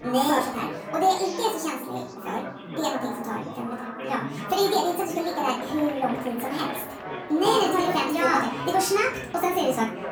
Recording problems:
off-mic speech; far
wrong speed and pitch; too fast and too high; 1.5 times normal speed
room echo; slight; dies away in 0.4 s
chatter from many people; loud; throughout; 9 dB below the speech

